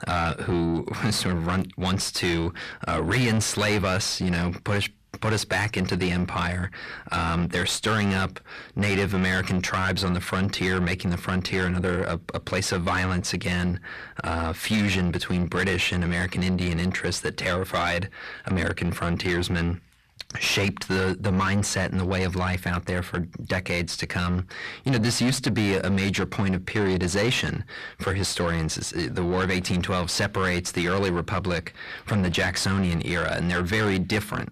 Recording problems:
distortion; heavy; 7 dB below the speech

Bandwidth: 14.5 kHz